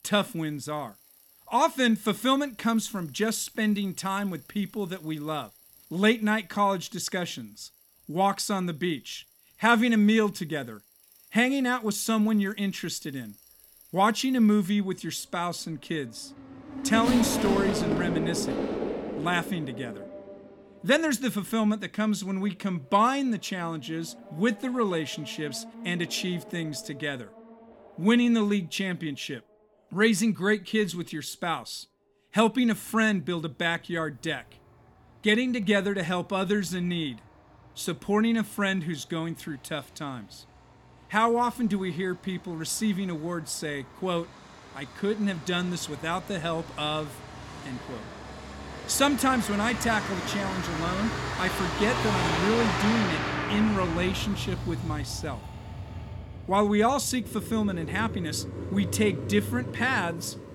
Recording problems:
traffic noise; loud; throughout; 6 dB below the speech

